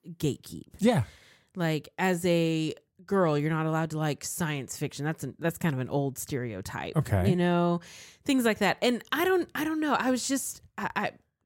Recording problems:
none

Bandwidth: 16 kHz